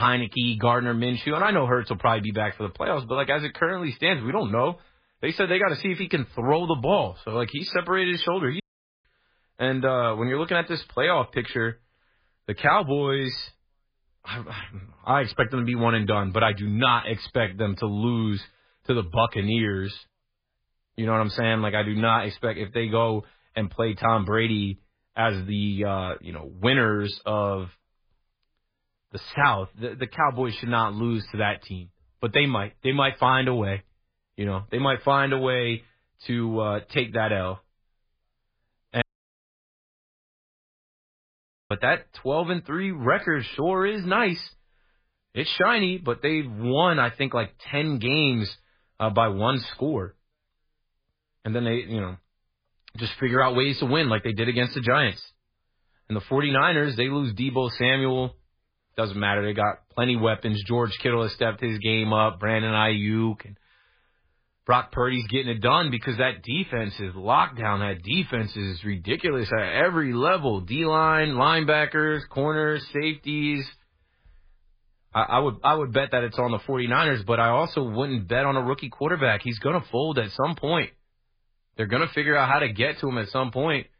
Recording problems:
garbled, watery; badly; nothing above 4 kHz
abrupt cut into speech; at the start
audio cutting out; at 8.5 s and at 39 s for 2.5 s

